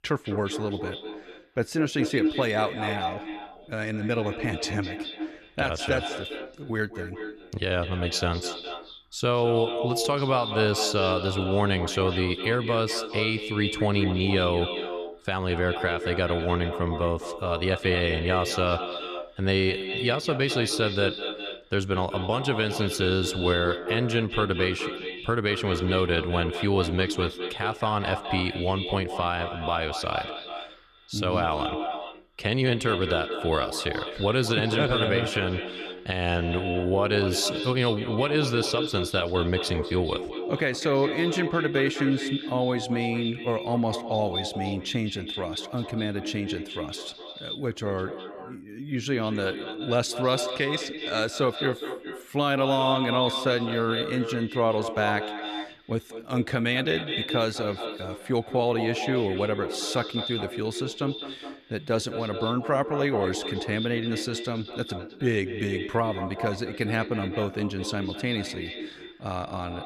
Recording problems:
echo of what is said; strong; throughout; 200 ms later, 6 dB below the speech

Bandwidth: 14 kHz